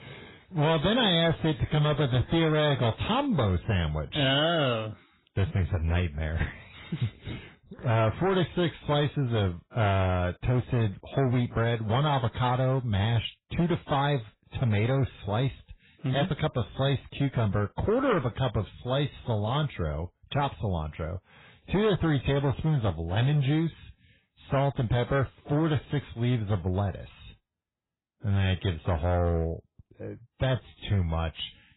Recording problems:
garbled, watery; badly; nothing above 4 kHz
distortion; slight; 11% of the sound clipped

